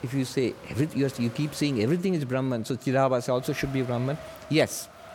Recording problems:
wind noise on the microphone; occasional gusts; 15 dB below the speech

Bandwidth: 17.5 kHz